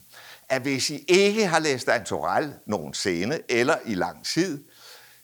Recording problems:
hiss; faint; throughout; 30 dB below the speech

